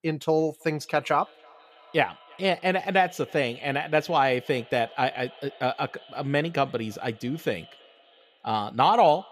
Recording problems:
echo of what is said; faint; throughout; 330 ms later, 25 dB below the speech

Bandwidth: 14.5 kHz